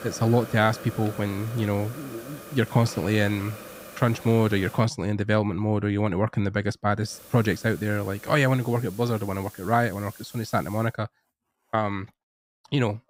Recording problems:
hiss; noticeable; until 5 s and from 7 to 11 s; 15 dB below the speech

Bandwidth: 15.5 kHz